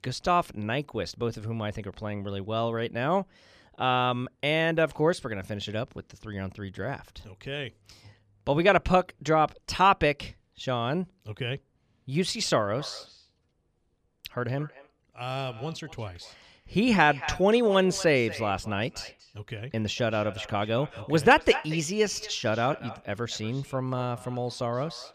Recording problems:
echo of what is said; noticeable; from 13 s on; 230 ms later, 15 dB below the speech

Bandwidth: 14.5 kHz